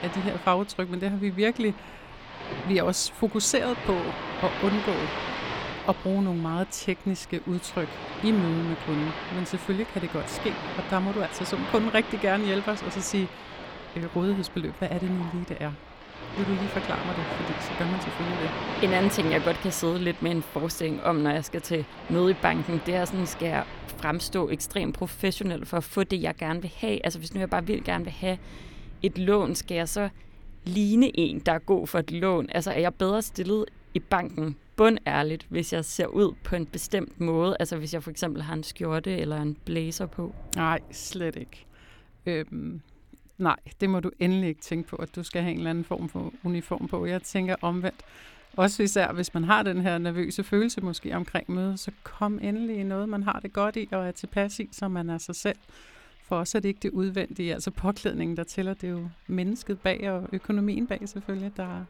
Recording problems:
rain or running water; loud; throughout; 9 dB below the speech

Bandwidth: 18 kHz